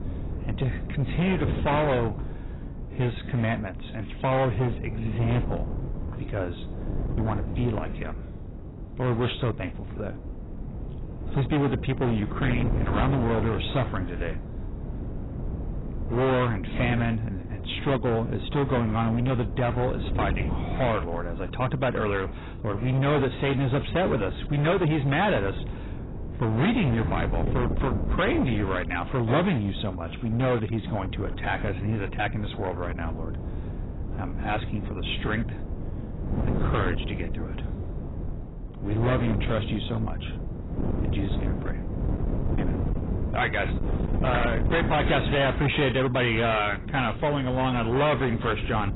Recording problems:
distortion; heavy; 15% of the sound clipped
garbled, watery; badly; nothing above 4 kHz
wind noise on the microphone; occasional gusts; 10 dB below the speech

